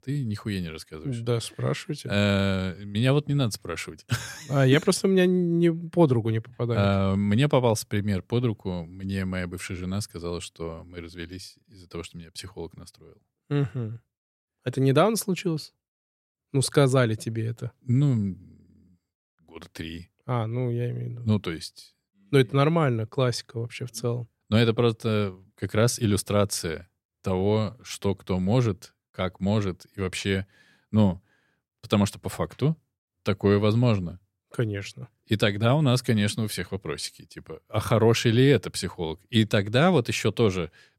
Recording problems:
none

